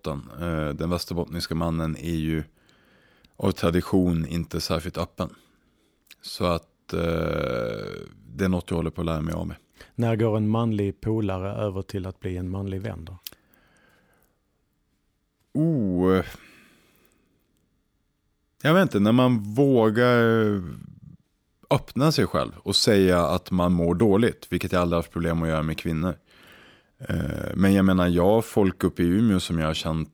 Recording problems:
none

